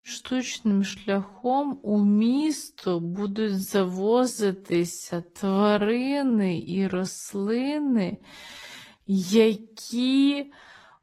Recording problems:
wrong speed, natural pitch; too slow; 0.5 times normal speed
garbled, watery; slightly

